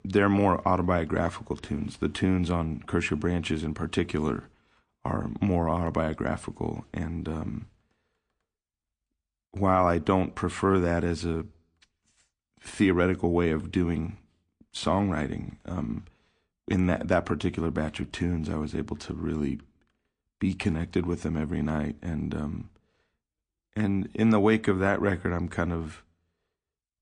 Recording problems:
garbled, watery; slightly; nothing above 9 kHz

